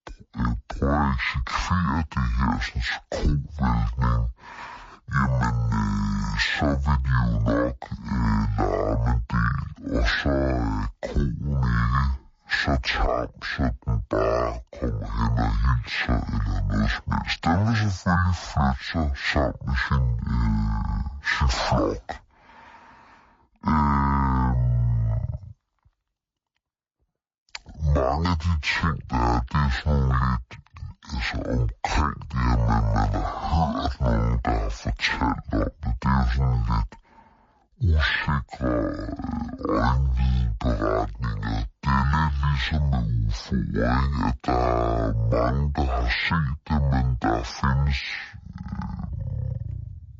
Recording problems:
wrong speed and pitch; too slow and too low; 0.5 times normal speed

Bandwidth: 7.5 kHz